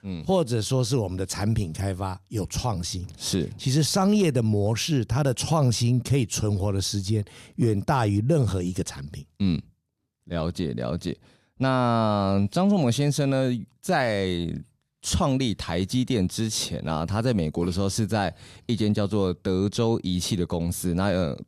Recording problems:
none

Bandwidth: 14.5 kHz